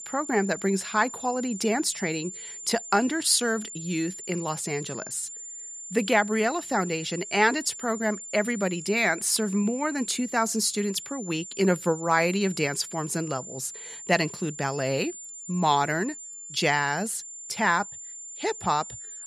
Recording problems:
high-pitched whine; noticeable; throughout; 7 kHz, 10 dB below the speech

